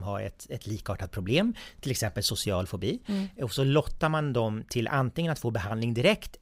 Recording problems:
abrupt cut into speech; at the start

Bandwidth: 15.5 kHz